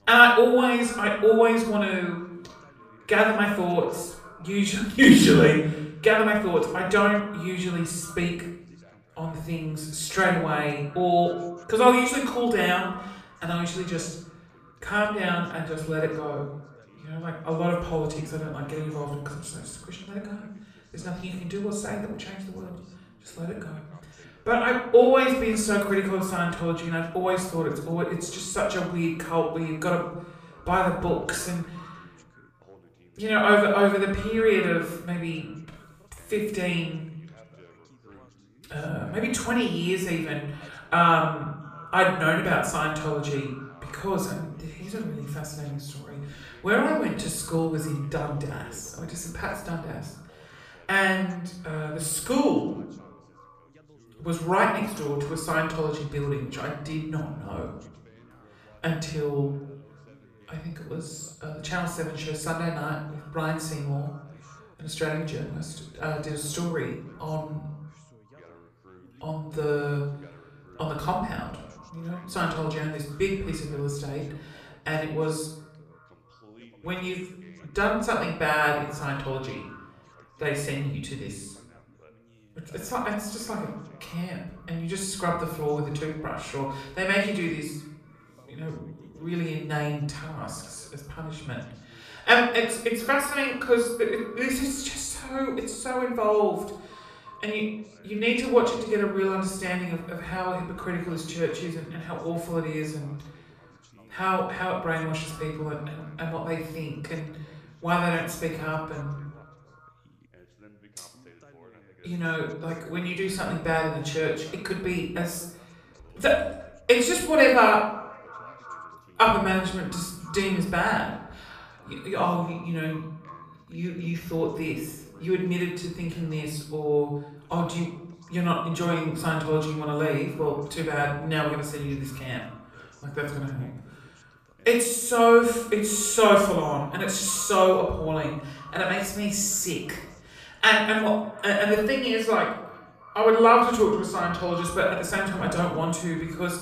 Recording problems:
off-mic speech; far
room echo; noticeable; dies away in 0.6 s
echo of what is said; faint; throughout; 350 ms later, 25 dB below the speech
background chatter; faint; throughout; 2 voices, 30 dB below the speech

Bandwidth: 14.5 kHz